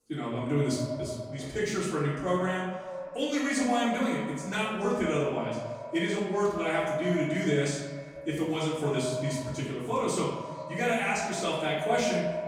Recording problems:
echo of what is said; strong; throughout; 120 ms later, 8 dB below the speech
off-mic speech; far
room echo; noticeable; dies away in 0.8 s
chatter from many people; faint; throughout; 30 dB below the speech

